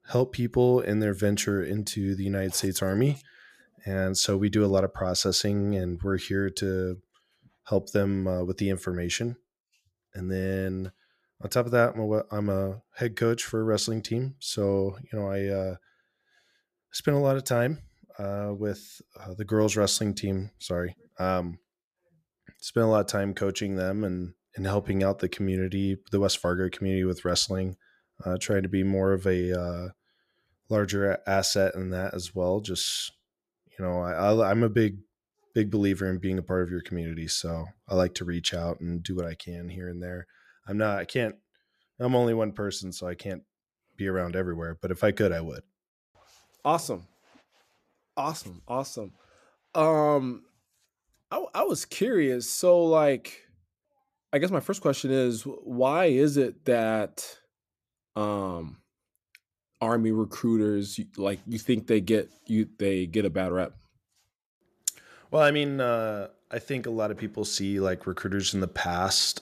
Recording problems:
none

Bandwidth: 14.5 kHz